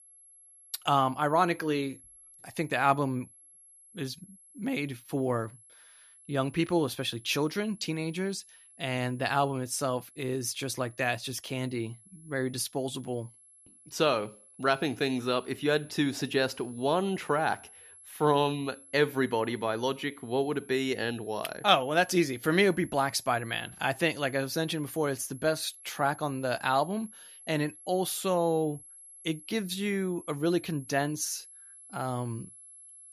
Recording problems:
high-pitched whine; faint; throughout; 11 kHz, 20 dB below the speech

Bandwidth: 13.5 kHz